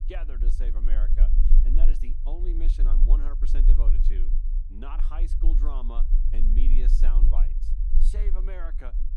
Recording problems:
low rumble; loud; throughout; 6 dB below the speech

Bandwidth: 15.5 kHz